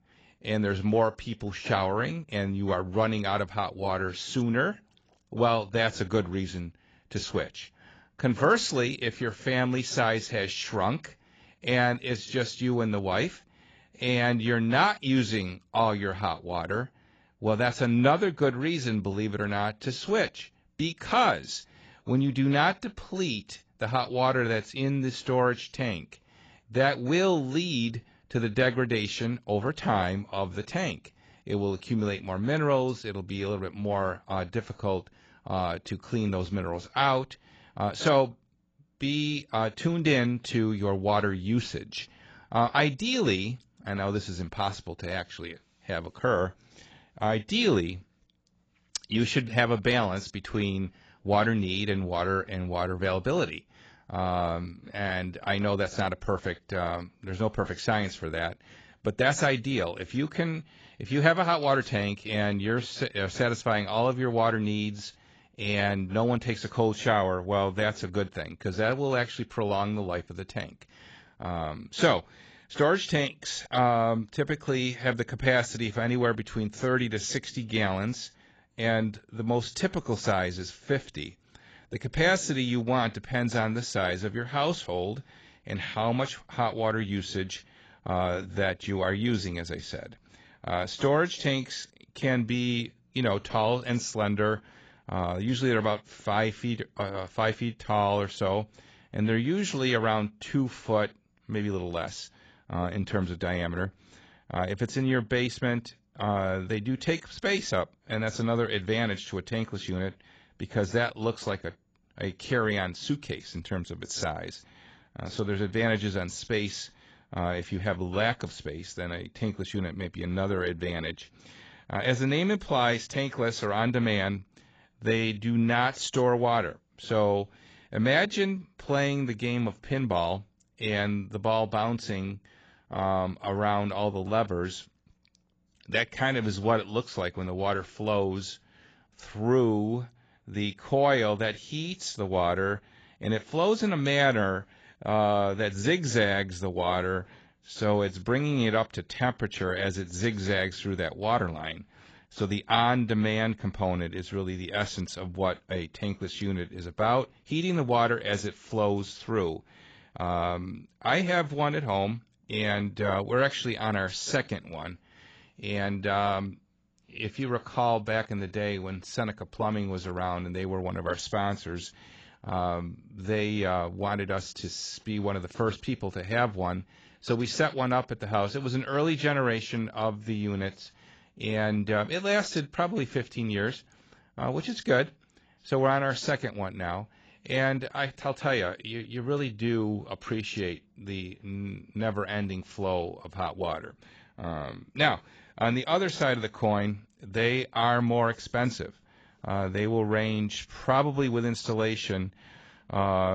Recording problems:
garbled, watery; badly; nothing above 7.5 kHz
abrupt cut into speech; at the end

